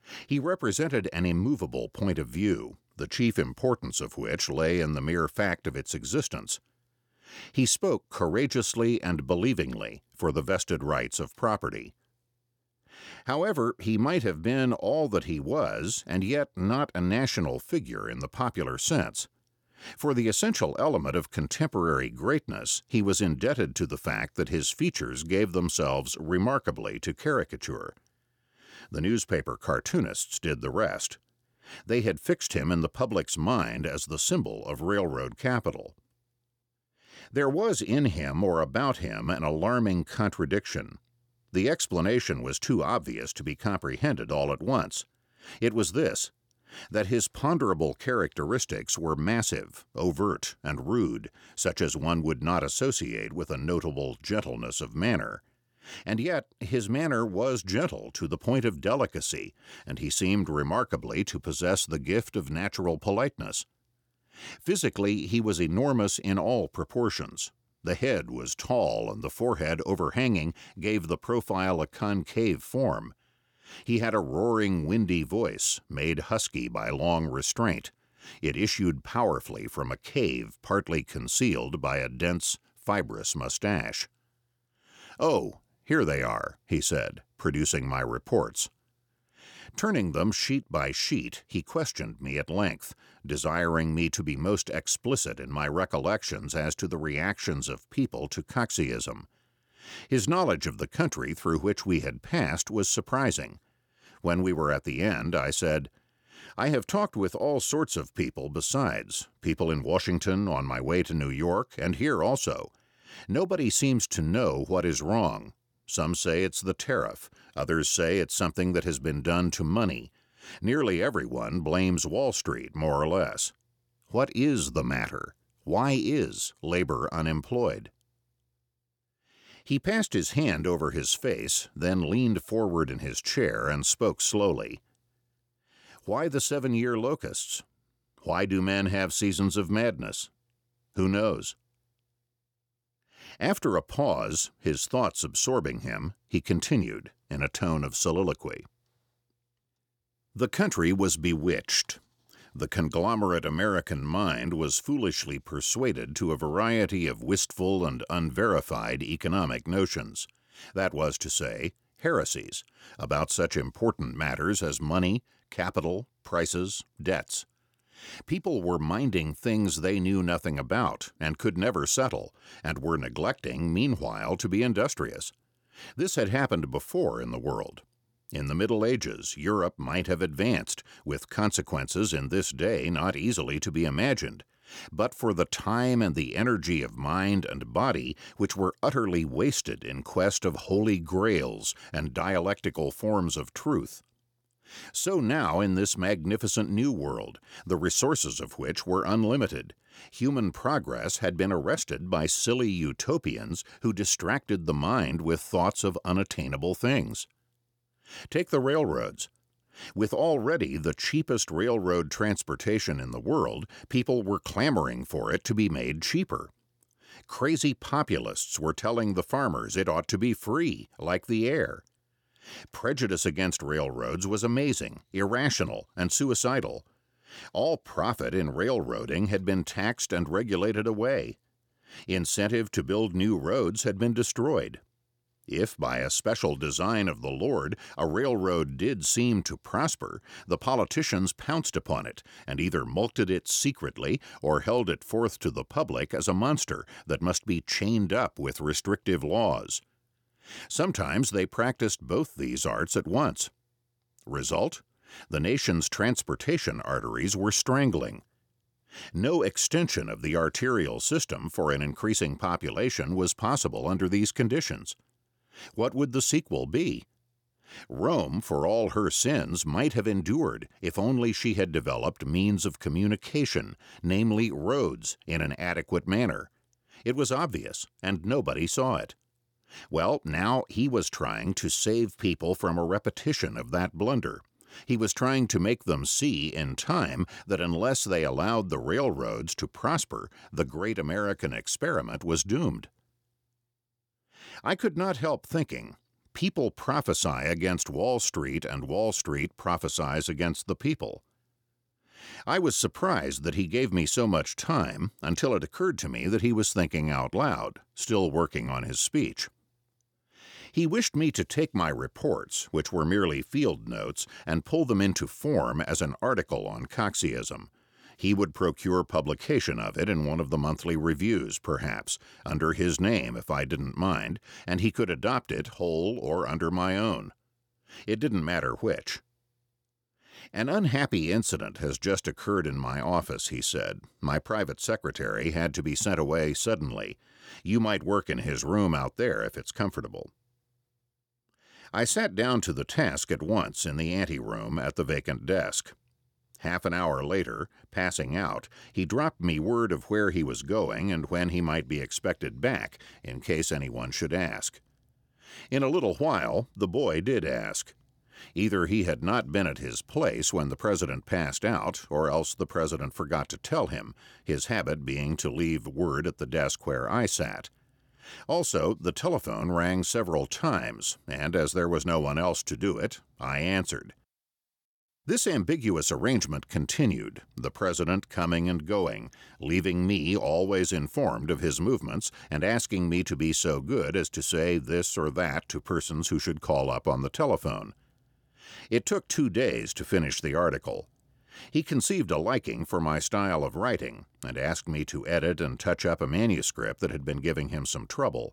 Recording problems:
none

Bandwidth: 18.5 kHz